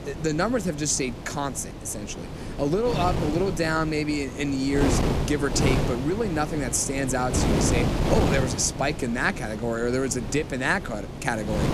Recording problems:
wind noise on the microphone; heavy; 6 dB below the speech

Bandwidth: 14.5 kHz